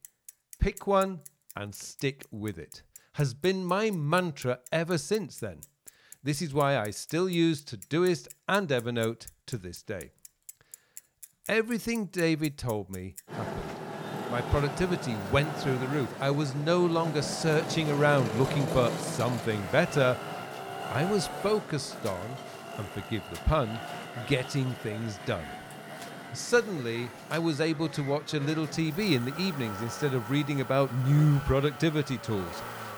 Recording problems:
traffic noise; loud; throughout; 10 dB below the speech

